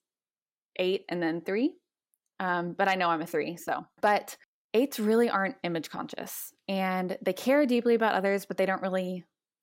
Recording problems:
none

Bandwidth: 16 kHz